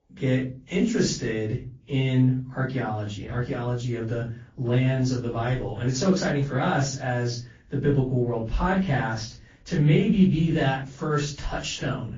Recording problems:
off-mic speech; far
room echo; very slight; dies away in 0.4 s
garbled, watery; slightly

